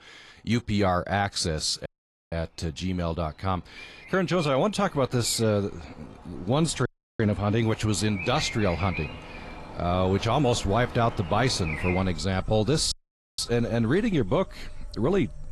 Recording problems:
garbled, watery; slightly; nothing above 11.5 kHz
animal sounds; noticeable; throughout; 15 dB below the speech
audio cutting out; at 2 s, at 7 s and at 13 s

